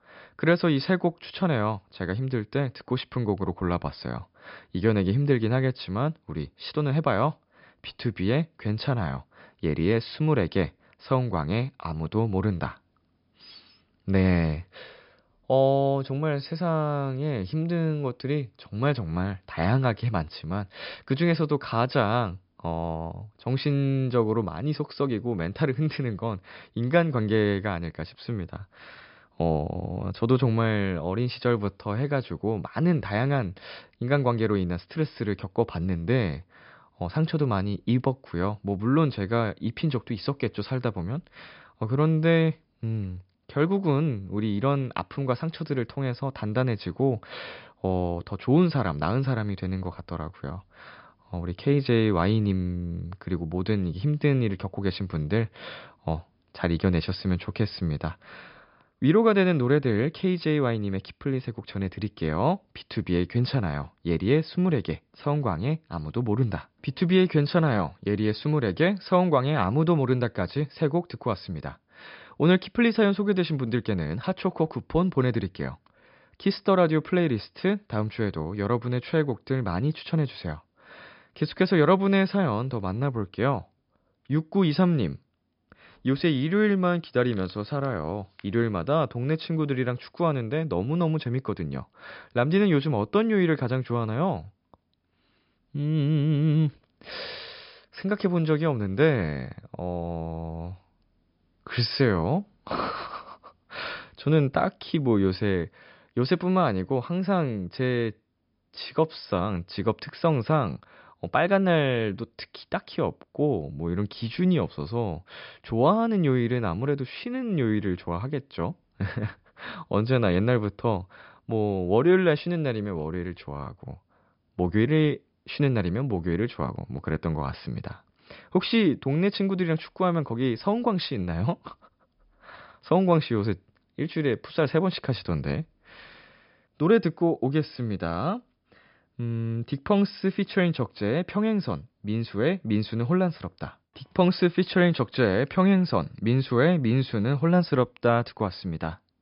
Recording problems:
high frequencies cut off; noticeable; nothing above 5.5 kHz

